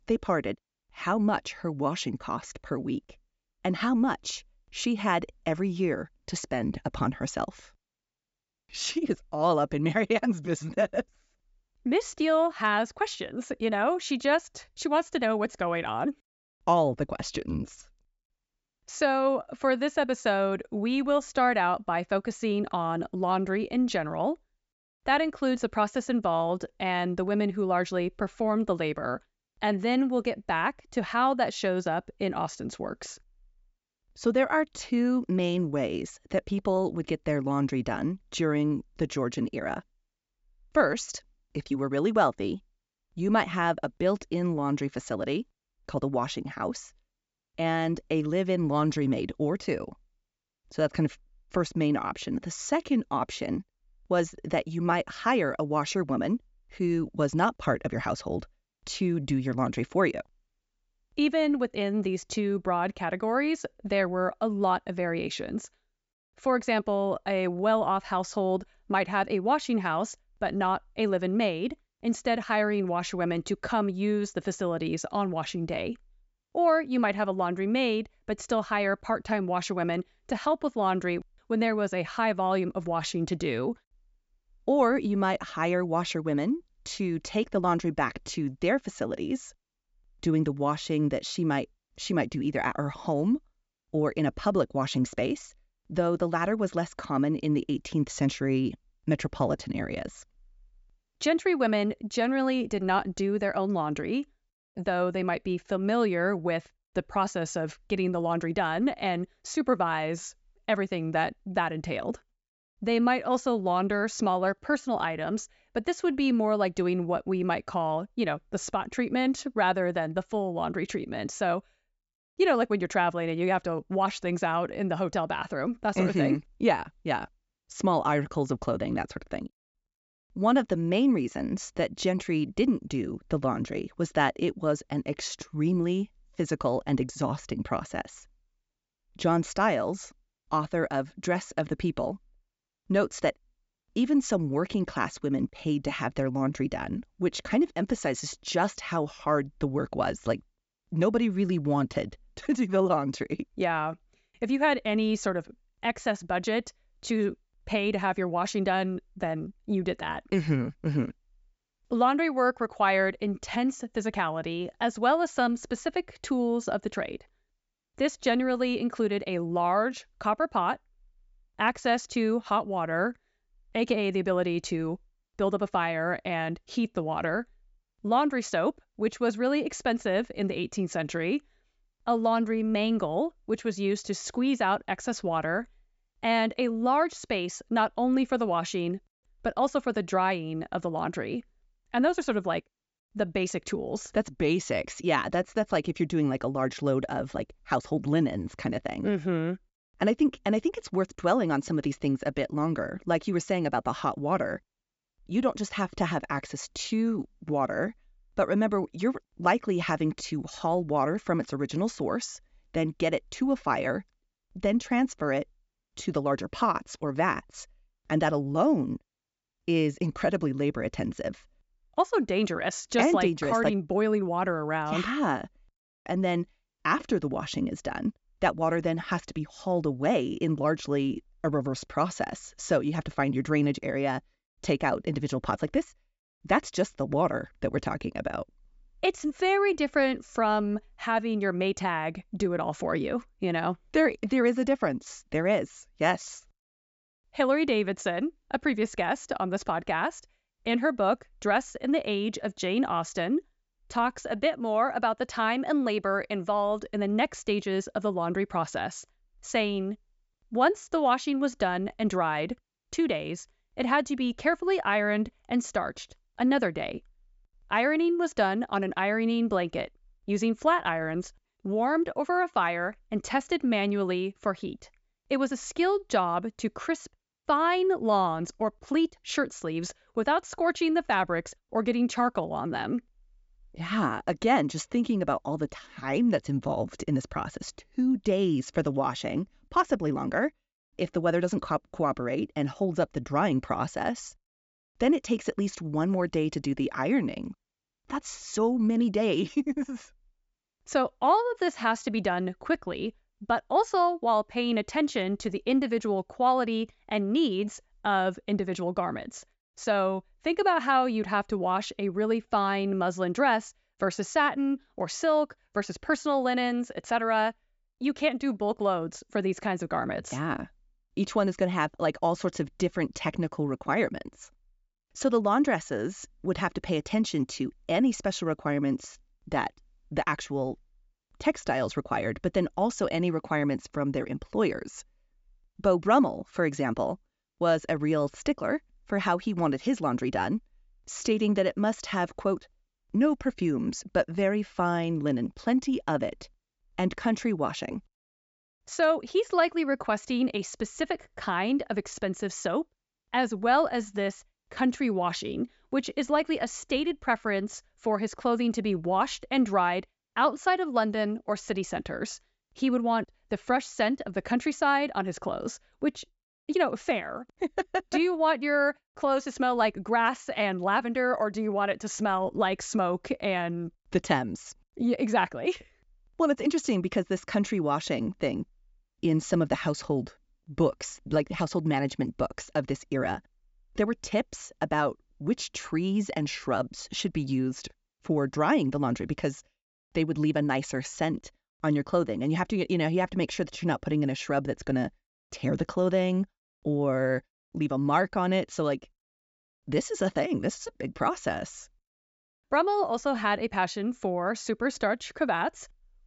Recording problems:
high frequencies cut off; noticeable; nothing above 8 kHz

